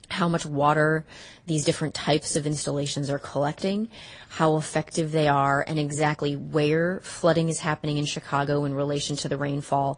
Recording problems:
garbled, watery; slightly; nothing above 10 kHz
uneven, jittery; strongly; from 1 to 8 s

